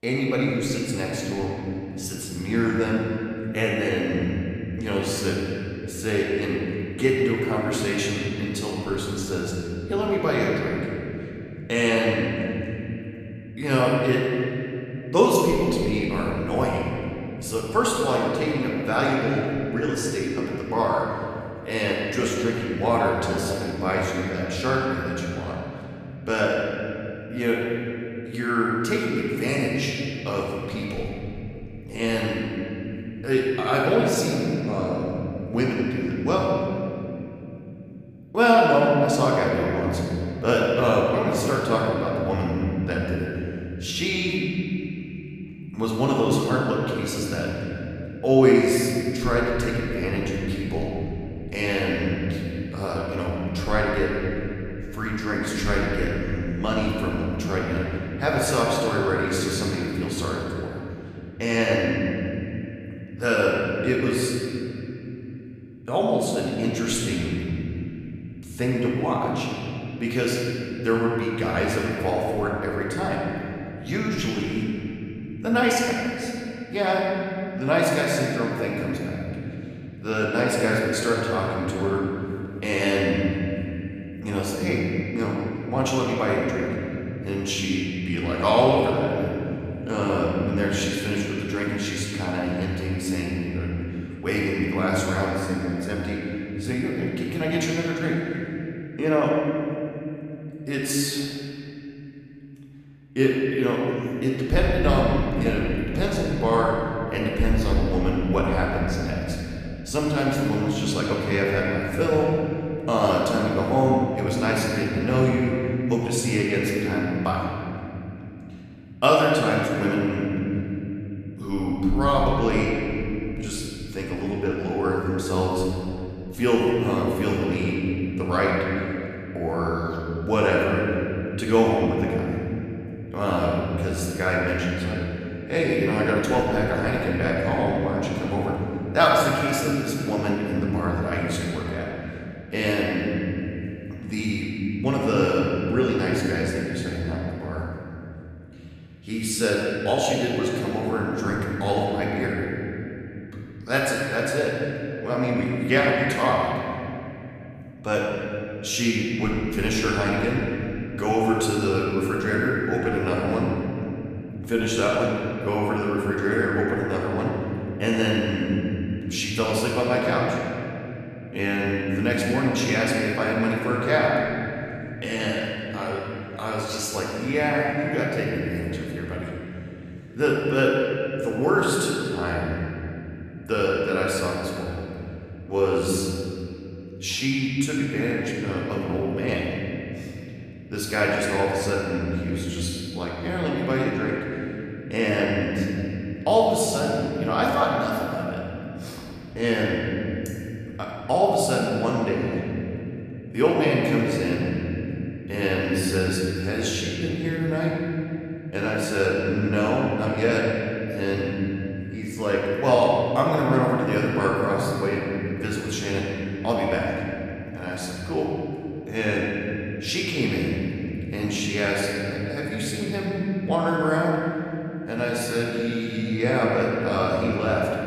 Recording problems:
off-mic speech; far
room echo; noticeable; dies away in 3 s

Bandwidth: 14.5 kHz